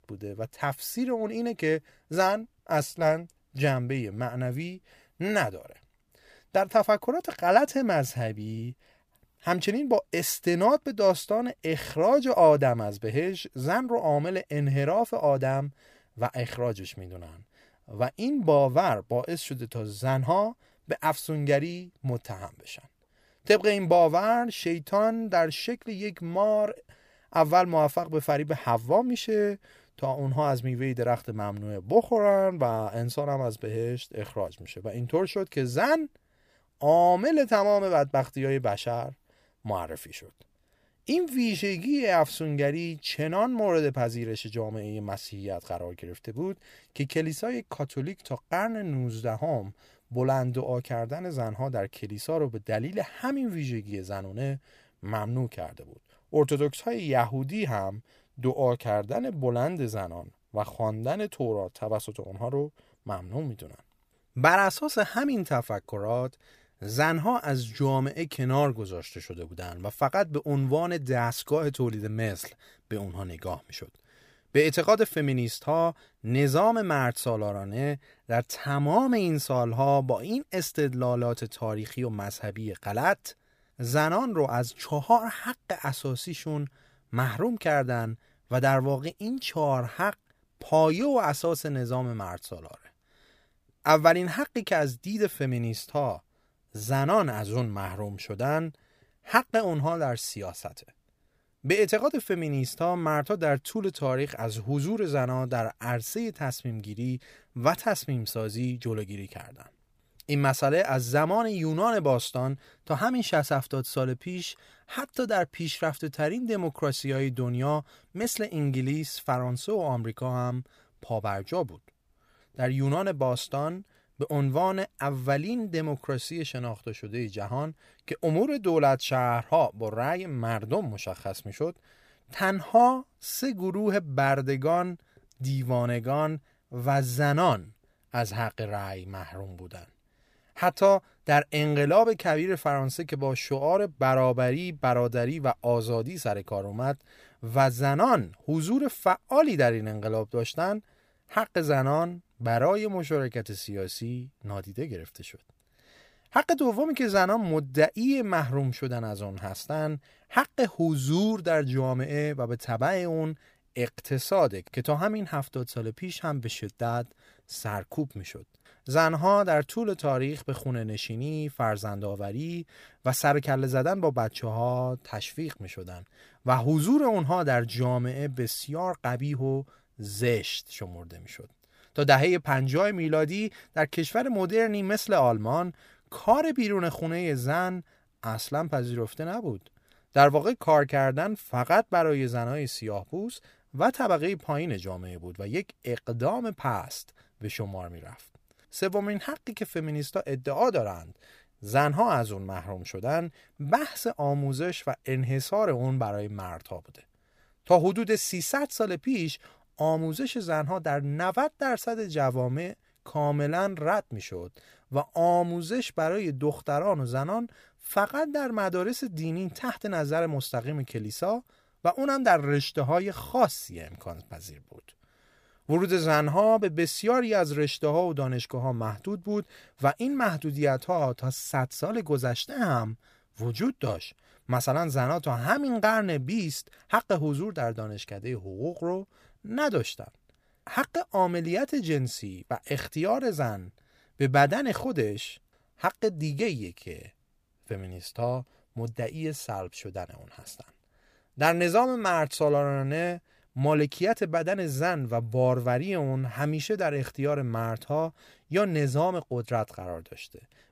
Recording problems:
none

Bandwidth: 15 kHz